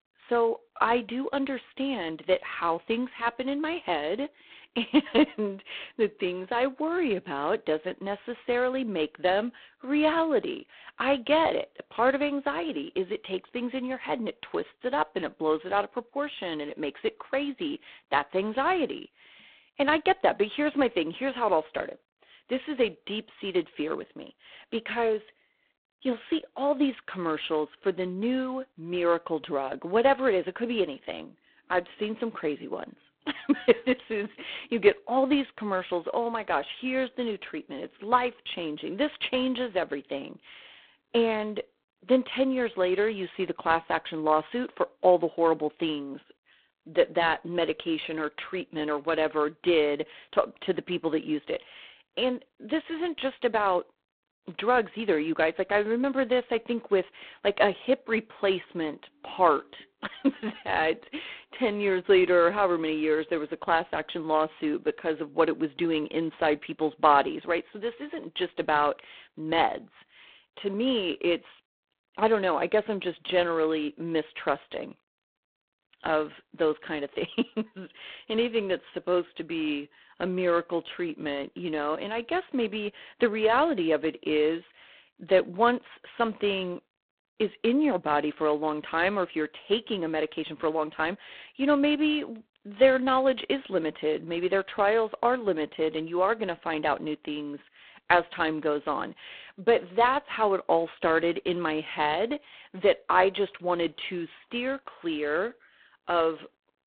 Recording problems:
phone-call audio; poor line

